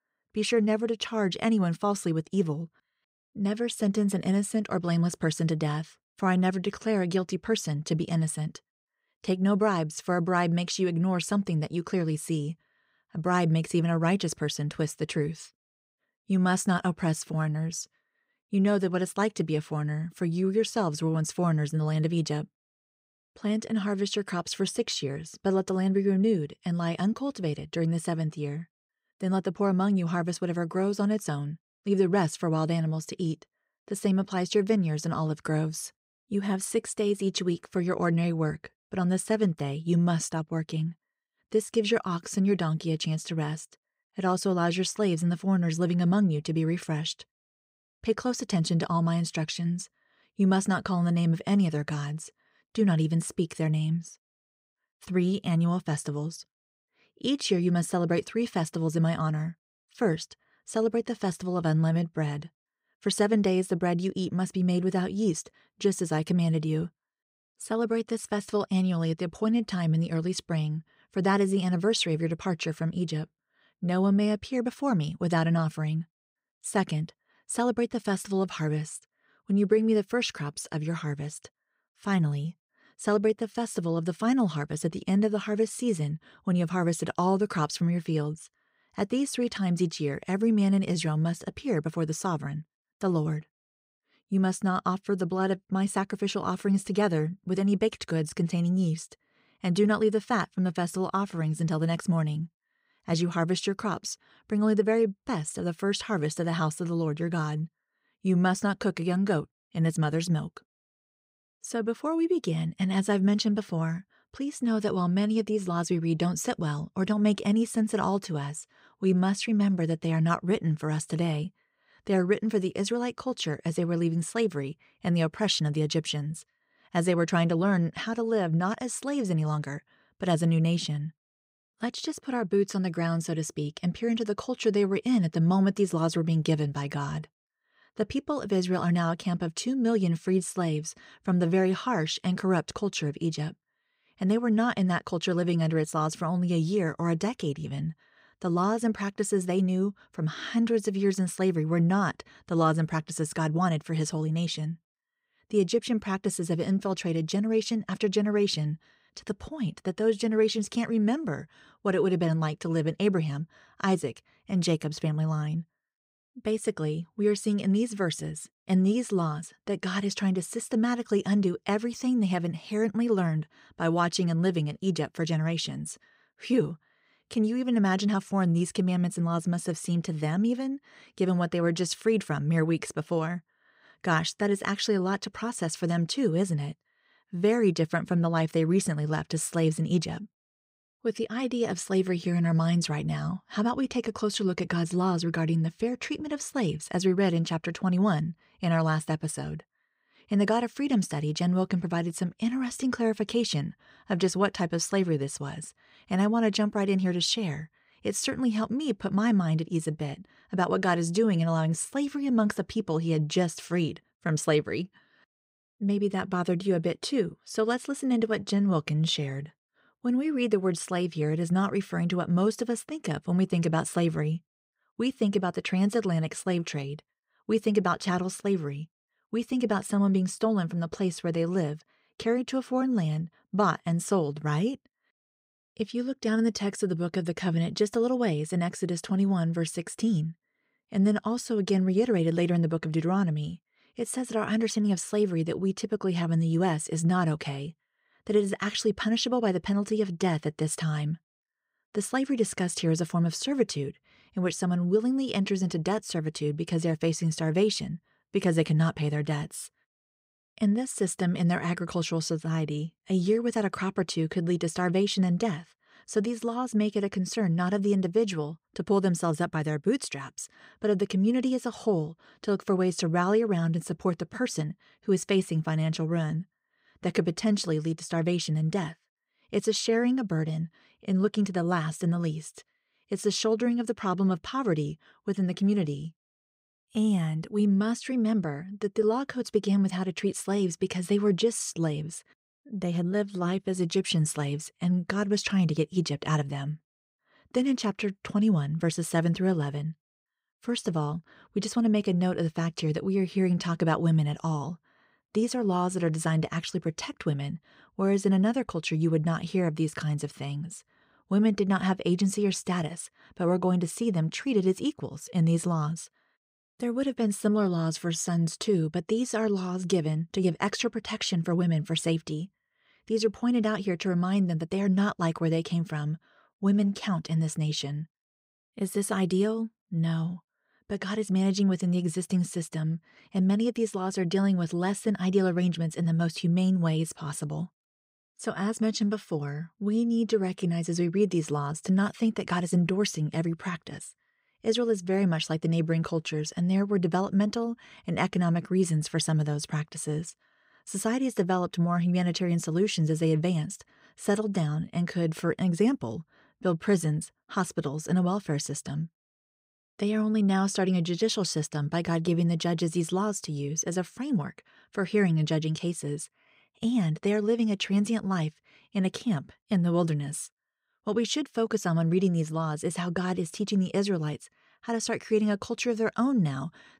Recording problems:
none

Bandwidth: 15.5 kHz